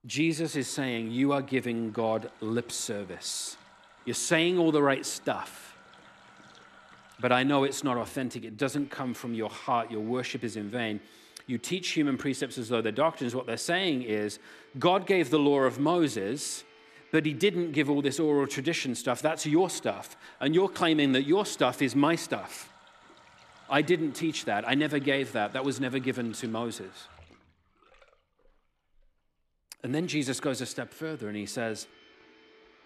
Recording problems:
household noises; faint; throughout; 25 dB below the speech

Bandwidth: 13.5 kHz